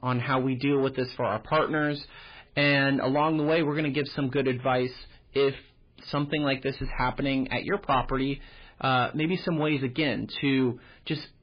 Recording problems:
garbled, watery; badly; nothing above 4 kHz
distortion; slight; 10 dB below the speech

